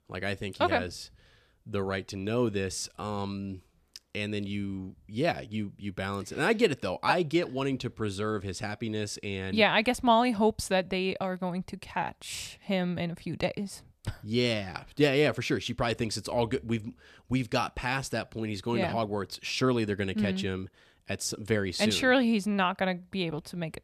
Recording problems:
none

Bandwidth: 14.5 kHz